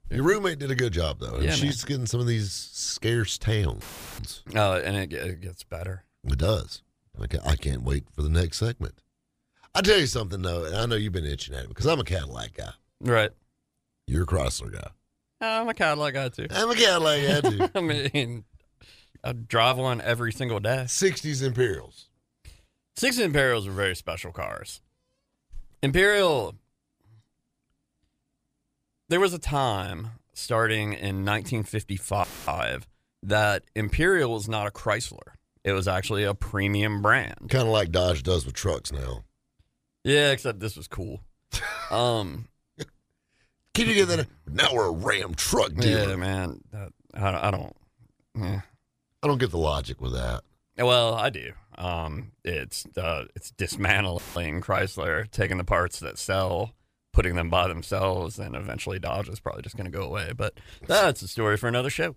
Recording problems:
audio cutting out; filled with static; at 4 s, at 32 s and at 54 s

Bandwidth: 15 kHz